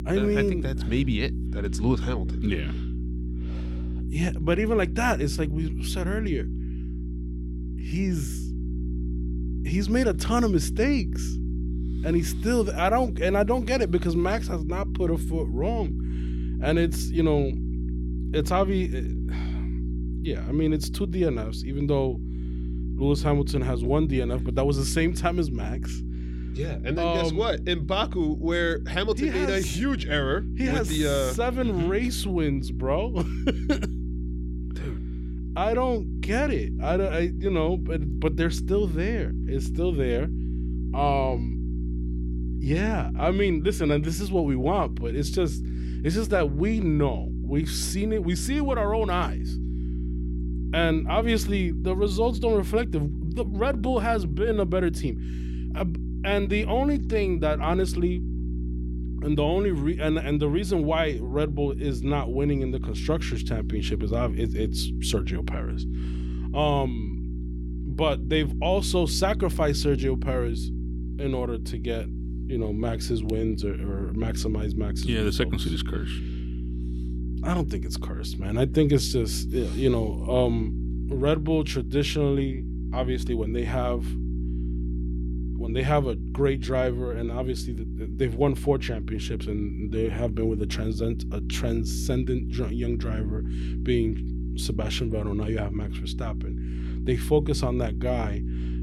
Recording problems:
electrical hum; noticeable; throughout; 60 Hz, 15 dB below the speech

